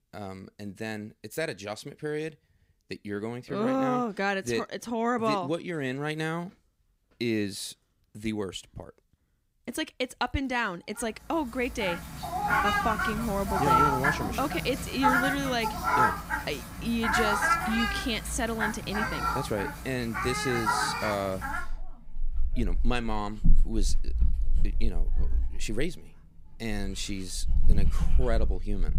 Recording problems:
animal sounds; very loud; from 12 s on; 3 dB above the speech

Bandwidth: 15.5 kHz